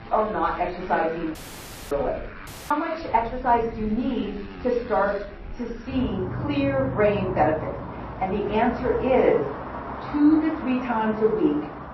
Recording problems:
off-mic speech; far
room echo; slight; dies away in 0.4 s
garbled, watery; slightly; nothing above 5.5 kHz
muffled; very slightly; fading above 2 kHz
traffic noise; noticeable; throughout; 10 dB below the speech
audio cutting out; at 1.5 s for 0.5 s and at 2.5 s

